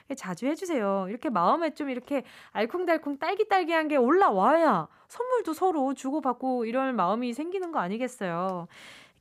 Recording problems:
none

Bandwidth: 15 kHz